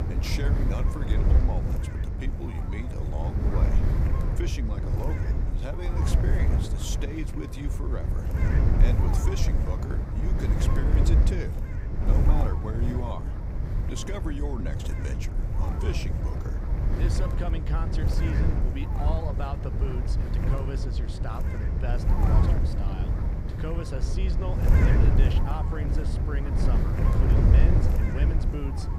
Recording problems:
wind noise on the microphone; heavy; 1 dB above the speech

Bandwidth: 15.5 kHz